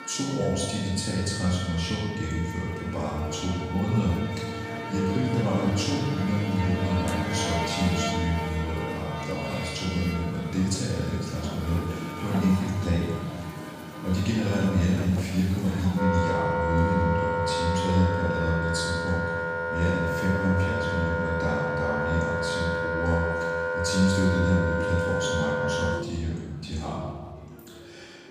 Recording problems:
room echo; strong; dies away in 1.2 s
off-mic speech; far
background music; loud; throughout; 3 dB below the speech
murmuring crowd; faint; throughout; 25 dB below the speech

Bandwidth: 15 kHz